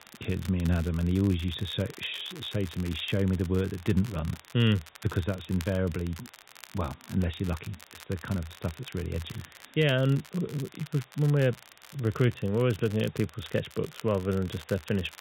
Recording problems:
high frequencies cut off; severe; nothing above 4 kHz
crackle, like an old record; noticeable; 20 dB below the speech
hiss; faint; throughout; 30 dB below the speech

